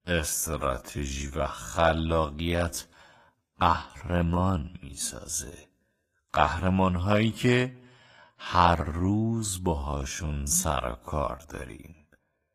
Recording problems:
wrong speed, natural pitch; too slow; 0.5 times normal speed
garbled, watery; slightly; nothing above 14.5 kHz

